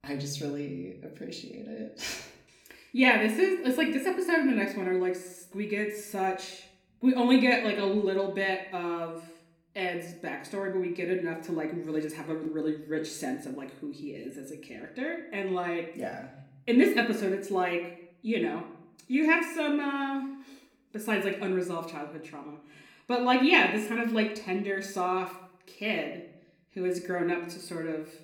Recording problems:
room echo; slight; dies away in 0.6 s
off-mic speech; somewhat distant

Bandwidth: 17.5 kHz